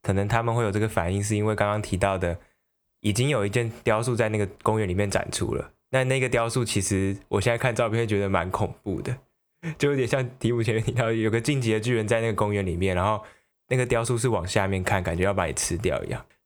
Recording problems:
squashed, flat; somewhat

